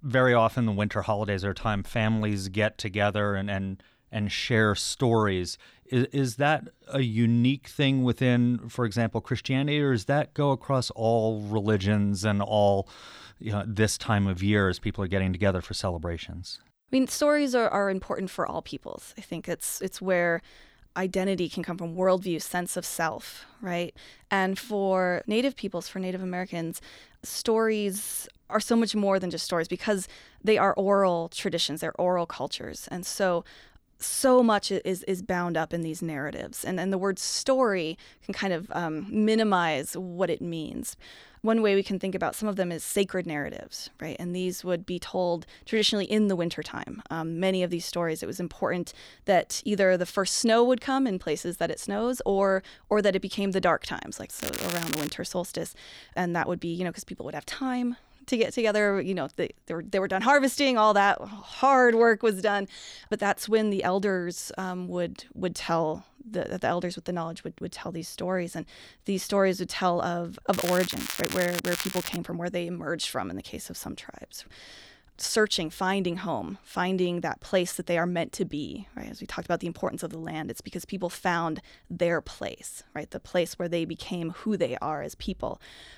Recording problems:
crackling; loud; at 54 s and from 1:11 to 1:12; 6 dB below the speech

